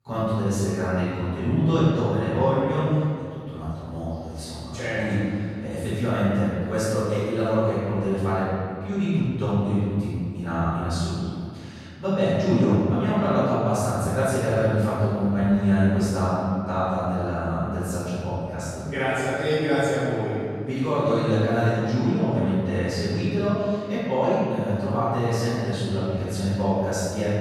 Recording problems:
room echo; strong; dies away in 2.1 s
off-mic speech; far

